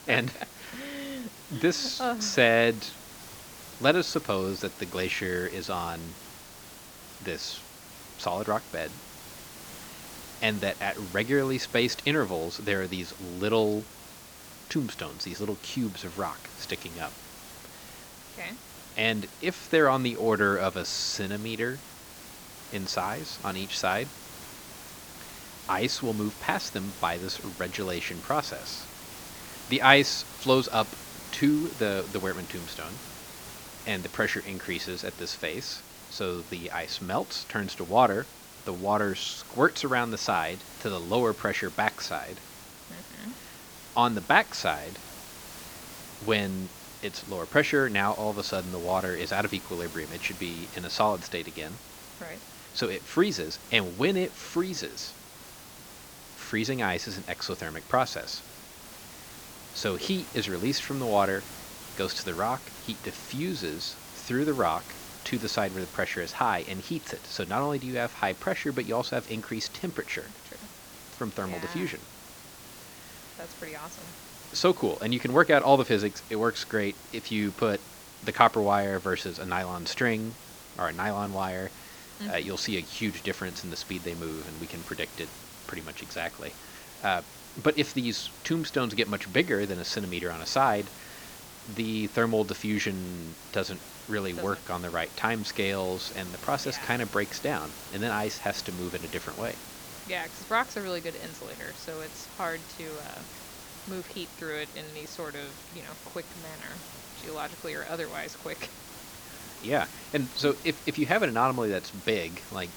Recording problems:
high frequencies cut off; noticeable; nothing above 8 kHz
hiss; noticeable; throughout; 15 dB below the speech

